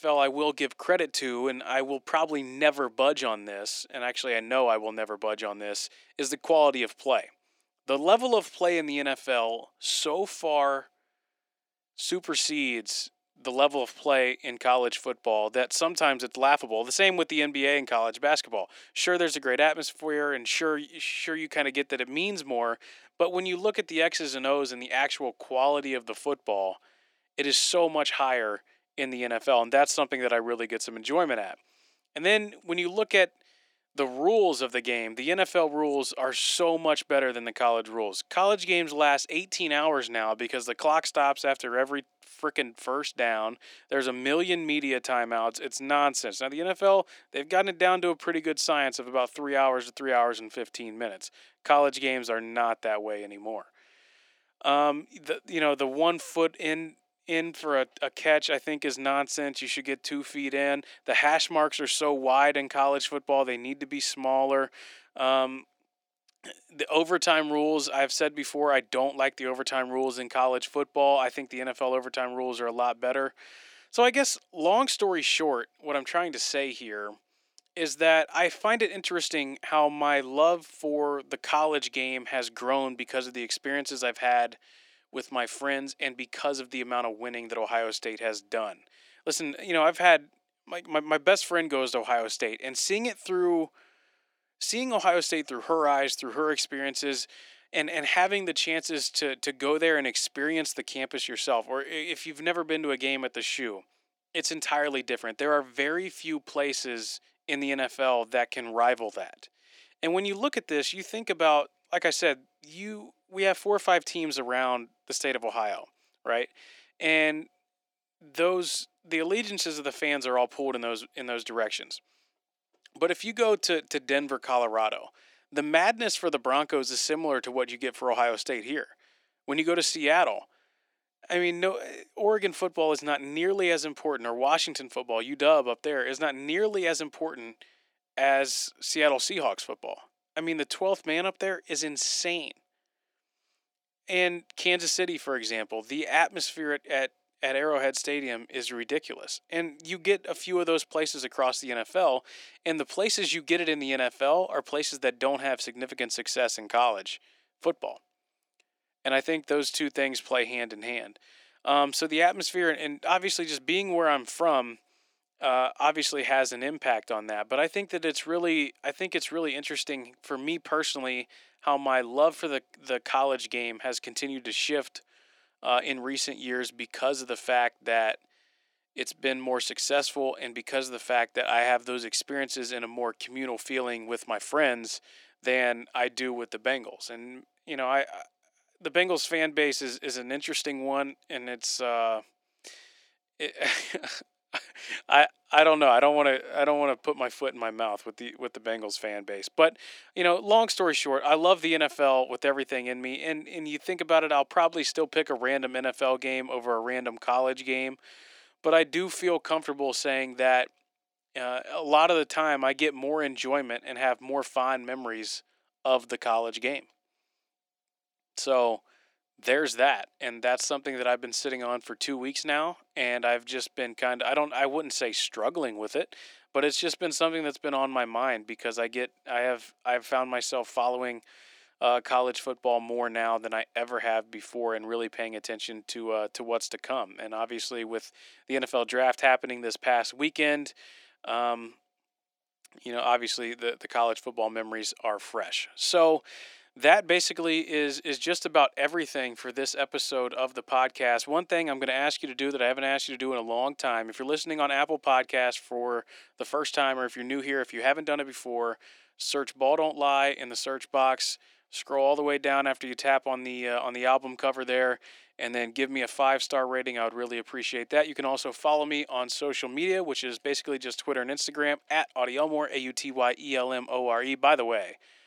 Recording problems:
thin; somewhat; fading below 300 Hz

